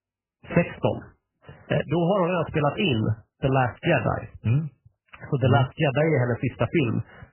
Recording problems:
garbled, watery; badly; nothing above 3 kHz

